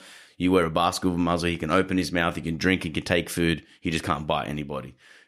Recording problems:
none

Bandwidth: 15 kHz